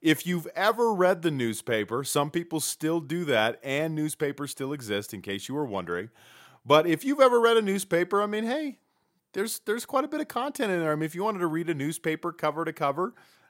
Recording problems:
none

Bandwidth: 16 kHz